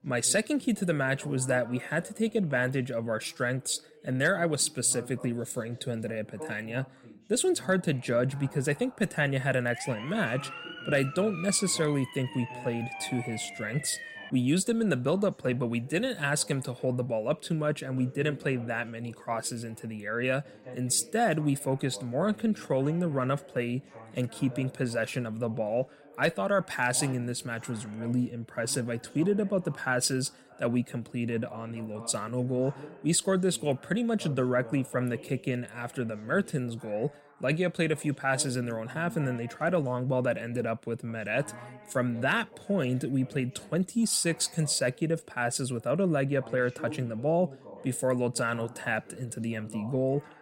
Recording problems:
background chatter; noticeable; throughout; 2 voices, 20 dB below the speech
siren; noticeable; from 9.5 to 14 s; peak 9 dB below the speech

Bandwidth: 16 kHz